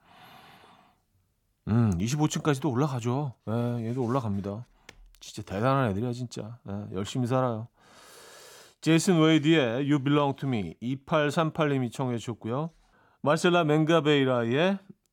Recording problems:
none

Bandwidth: 17.5 kHz